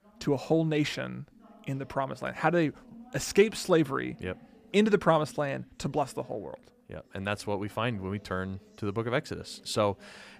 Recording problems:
voice in the background; faint; throughout; 25 dB below the speech

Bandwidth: 15 kHz